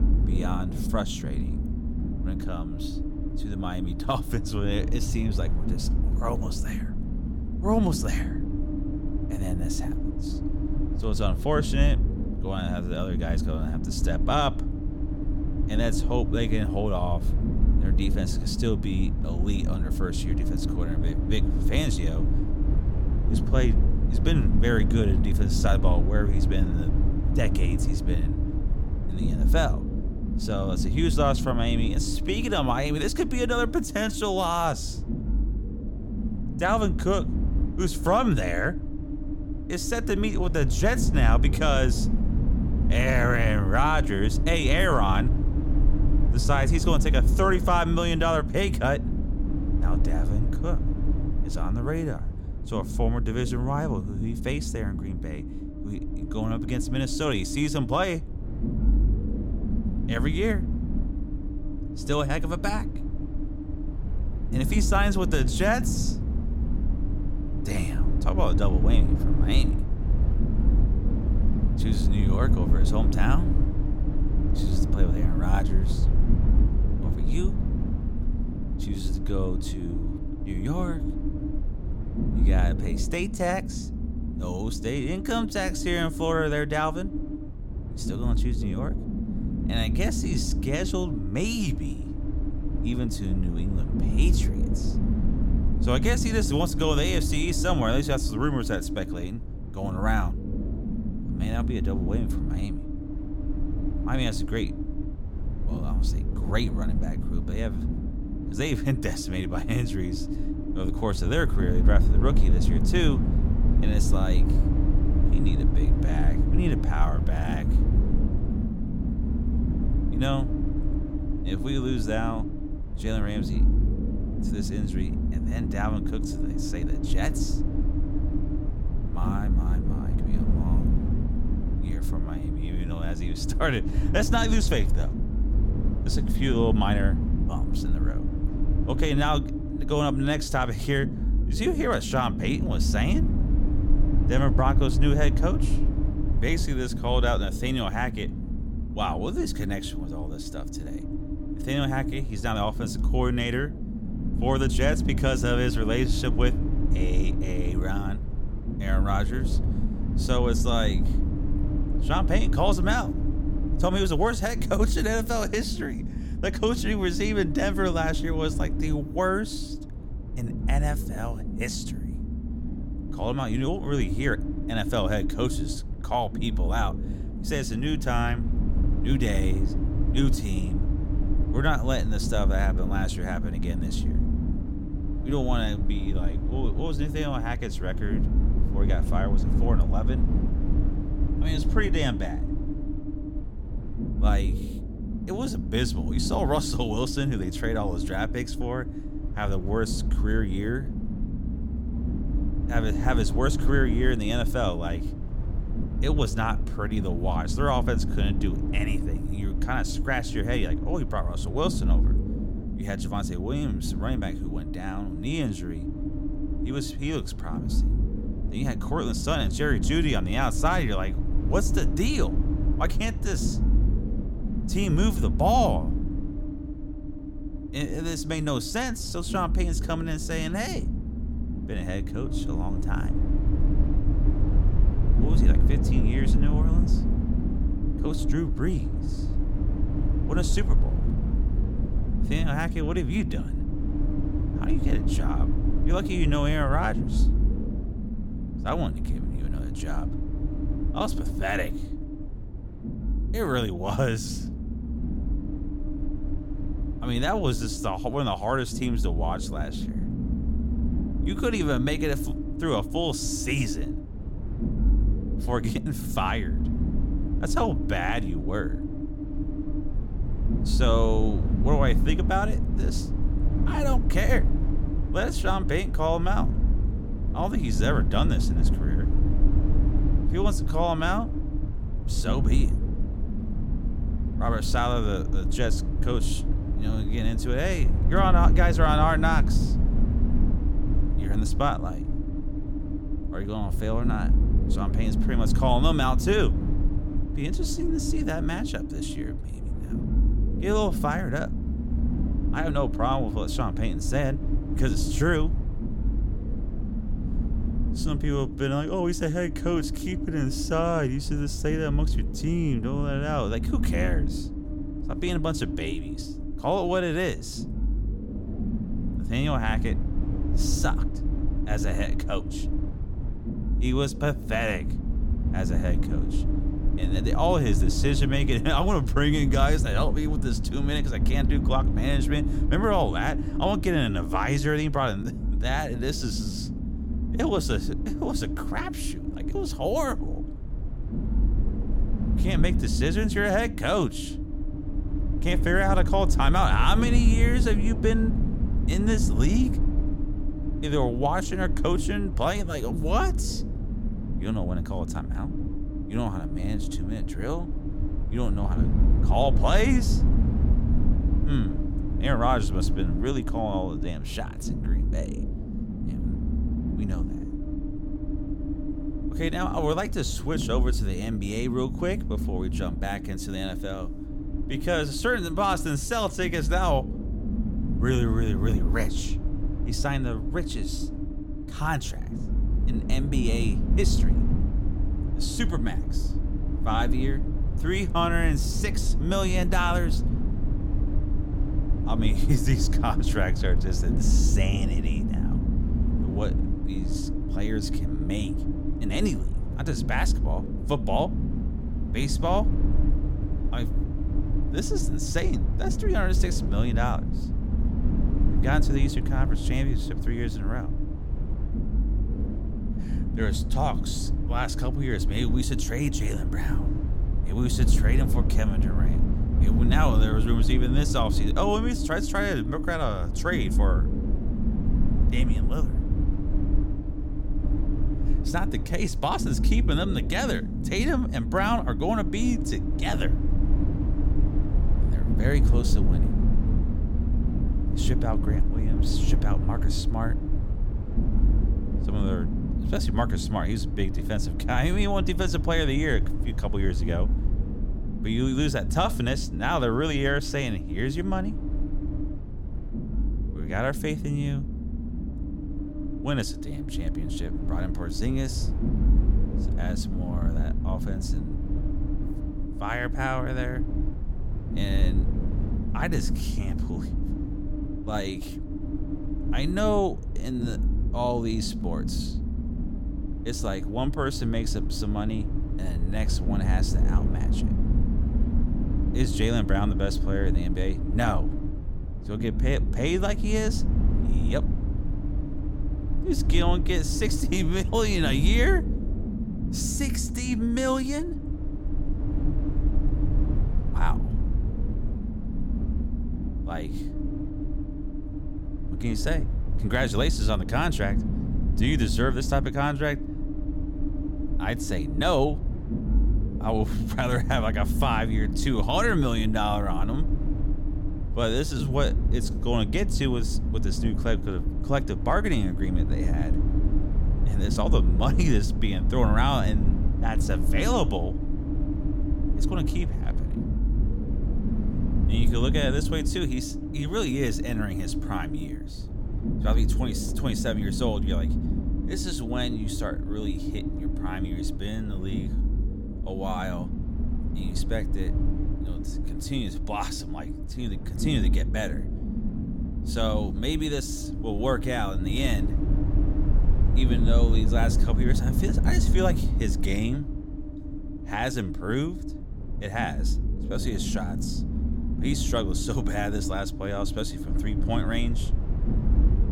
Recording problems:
low rumble; loud; throughout; 9 dB below the speech

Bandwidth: 17 kHz